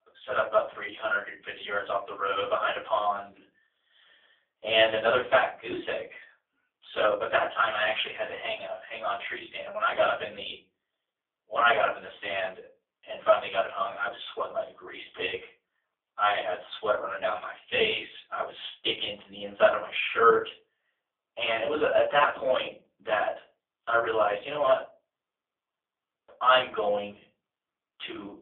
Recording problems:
phone-call audio; poor line; nothing above 3.5 kHz
off-mic speech; far
thin; very; fading below 650 Hz
room echo; slight; dies away in 0.3 s

